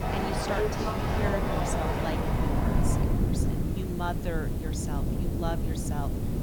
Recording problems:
train or aircraft noise; very loud; throughout; 5 dB above the speech
wind noise on the microphone; heavy; 1 dB below the speech
electrical hum; noticeable; throughout; 60 Hz, 15 dB below the speech
hiss; noticeable; throughout; 10 dB below the speech

